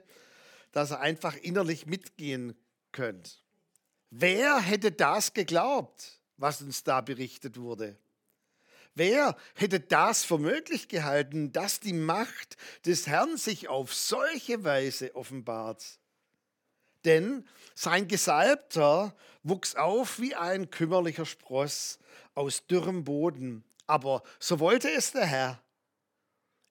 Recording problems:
none

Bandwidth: 18 kHz